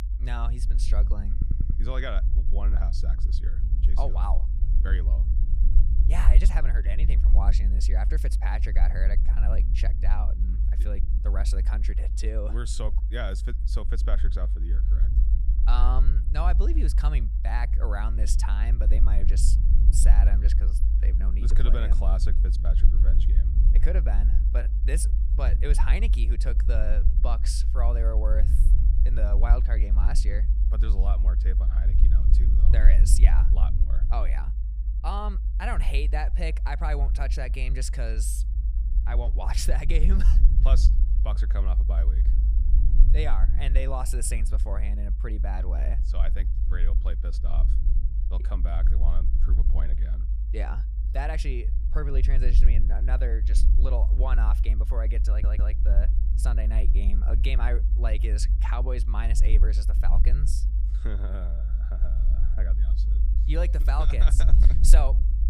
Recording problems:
low rumble; loud; throughout; 8 dB below the speech
audio stuttering; at 1.5 s and at 55 s

